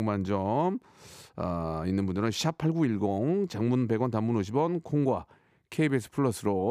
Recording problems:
abrupt cut into speech; at the start and the end

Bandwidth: 15 kHz